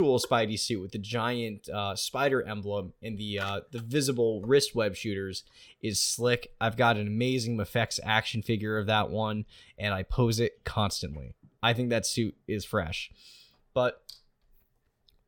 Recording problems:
abrupt cut into speech; at the start

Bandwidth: 17 kHz